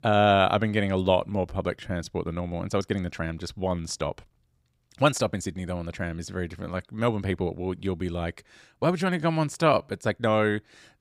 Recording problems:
uneven, jittery; strongly; from 1.5 to 10 s

